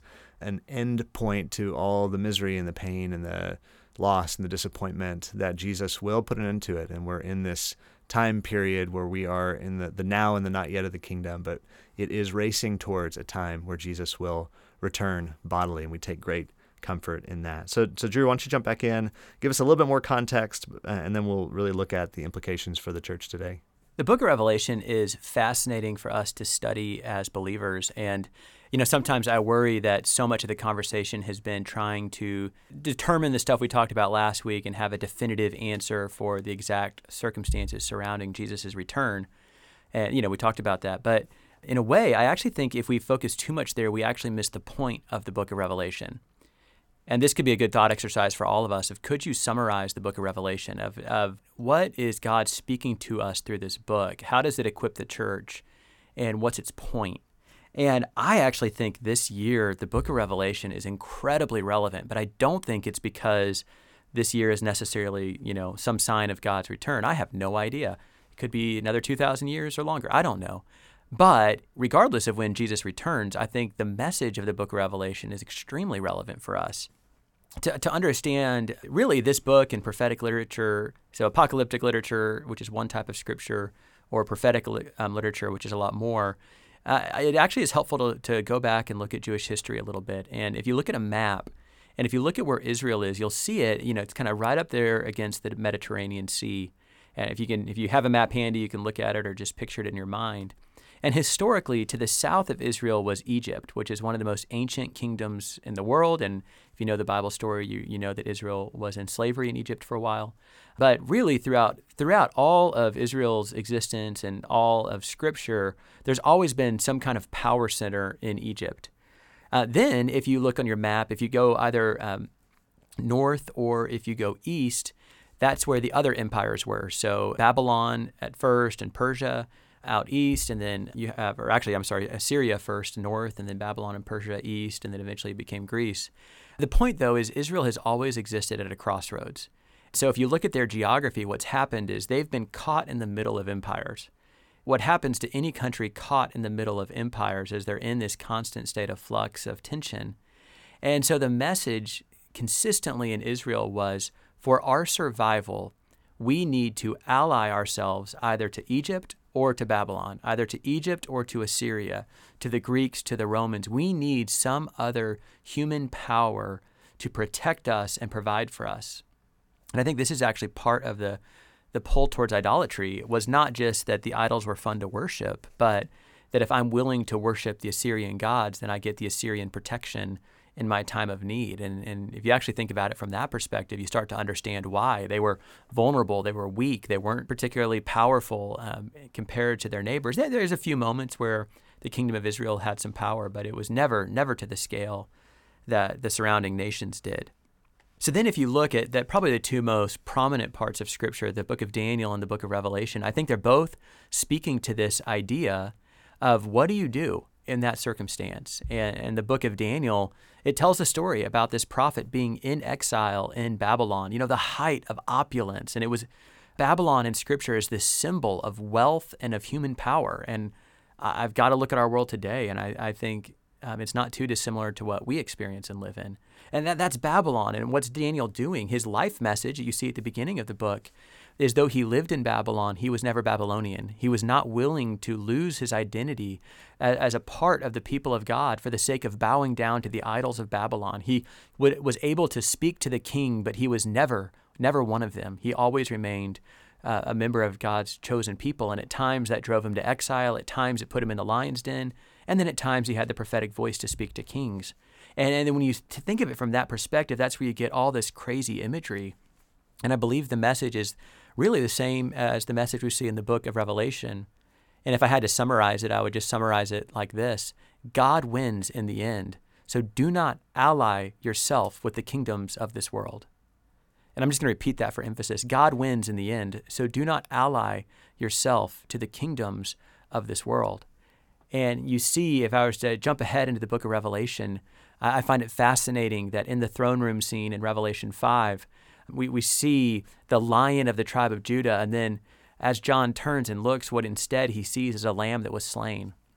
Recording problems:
none

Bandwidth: 18 kHz